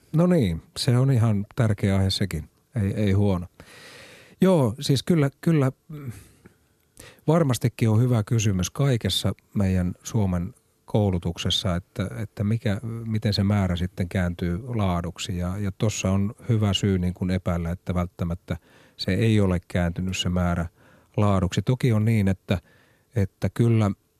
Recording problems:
none

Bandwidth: 14 kHz